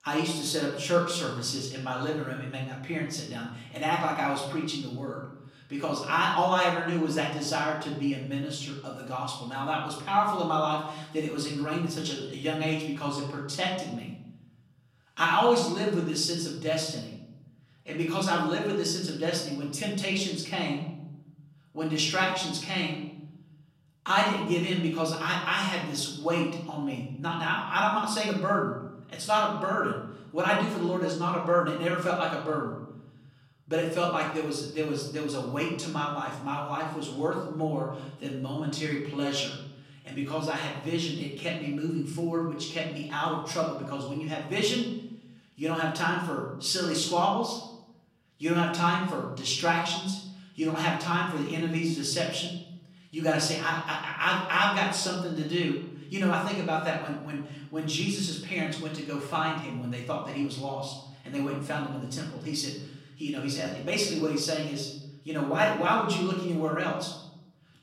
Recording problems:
off-mic speech; far
room echo; noticeable; dies away in 0.8 s

